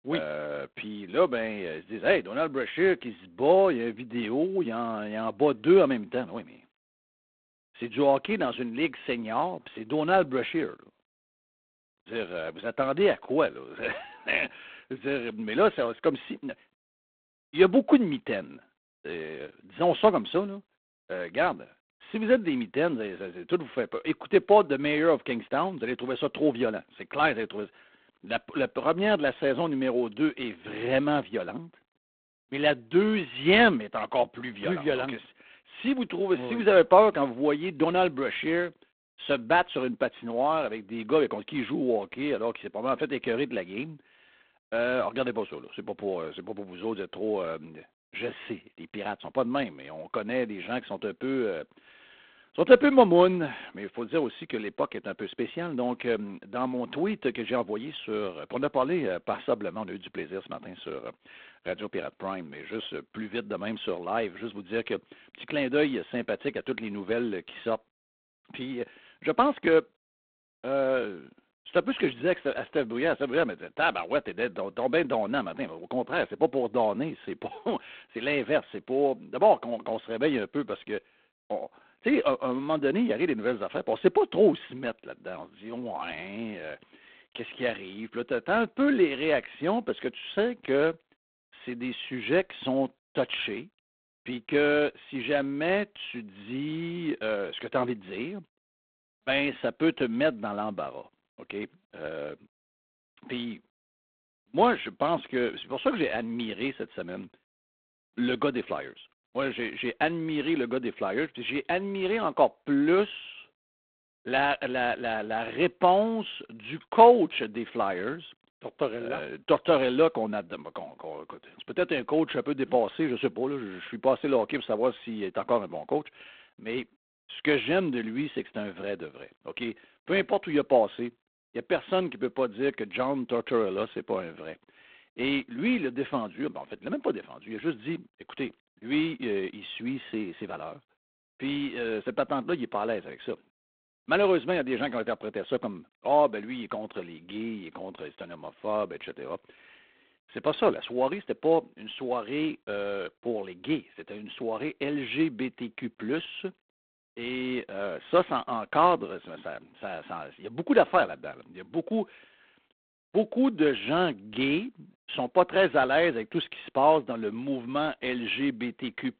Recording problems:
phone-call audio; poor line; nothing above 3.5 kHz

